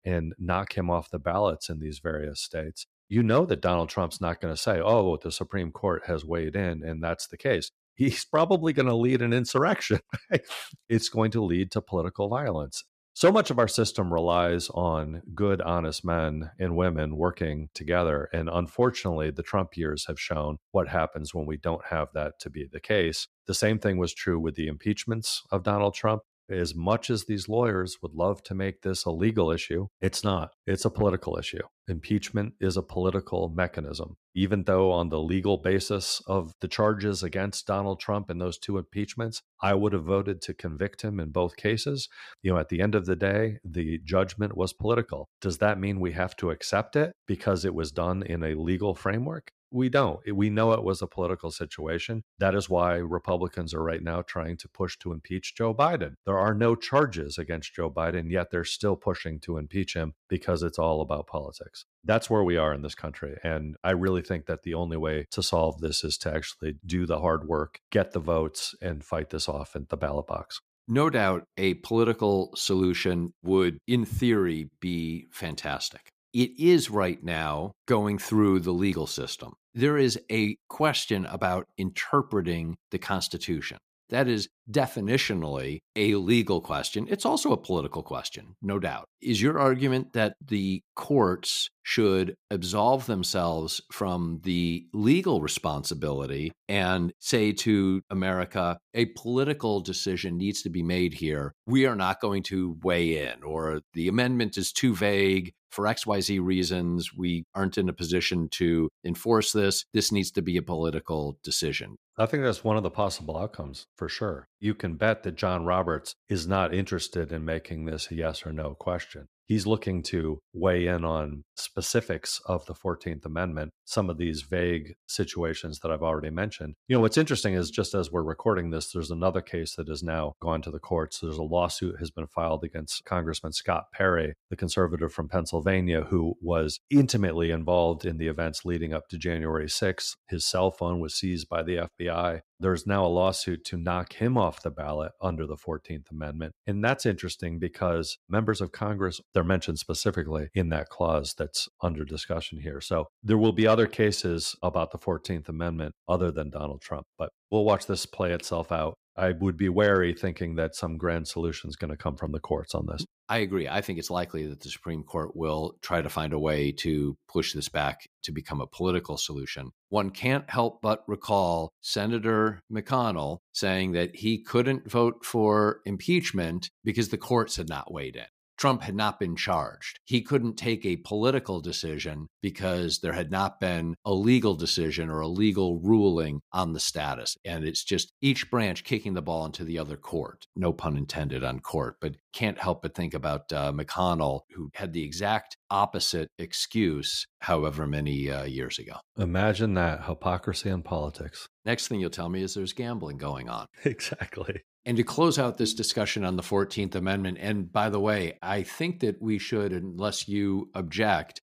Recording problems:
none

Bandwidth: 15 kHz